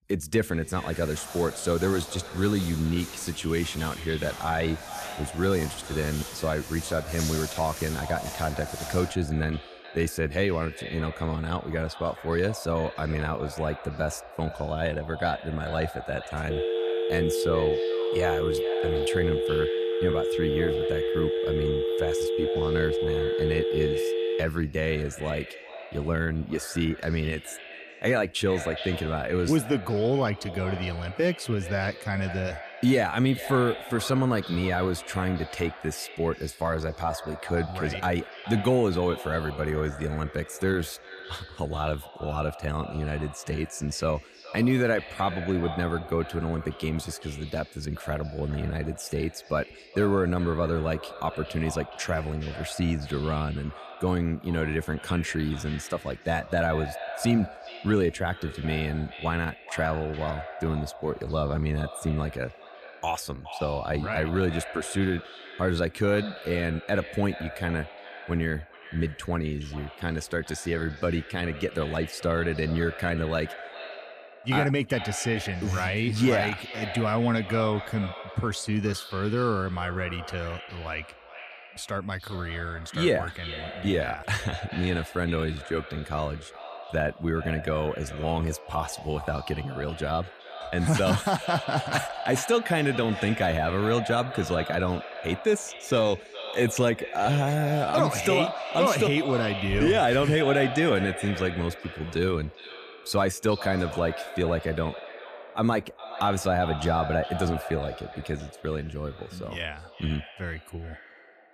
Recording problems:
echo of what is said; strong; throughout; 420 ms later, 10 dB below the speech
footsteps; noticeable; until 9 s; peak 4 dB below the speech
phone ringing; loud; from 17 to 24 s; peak 1 dB above the speech

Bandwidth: 14.5 kHz